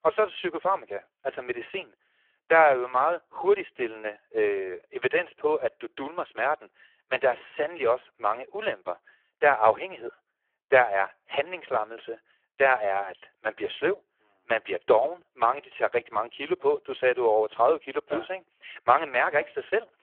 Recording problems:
phone-call audio; poor line

